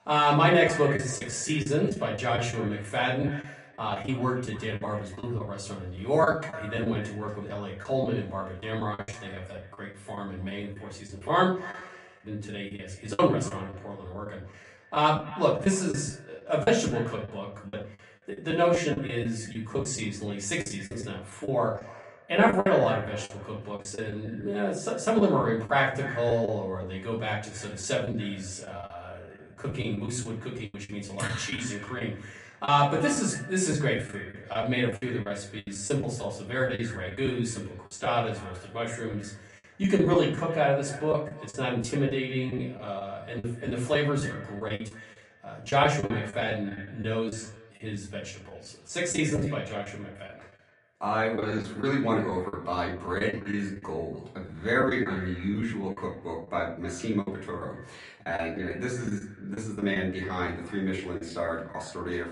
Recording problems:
off-mic speech; far
echo of what is said; noticeable; throughout; 290 ms later, 15 dB below the speech
room echo; slight; dies away in 0.4 s
garbled, watery; slightly; nothing above 9.5 kHz
choppy; very; 10% of the speech affected

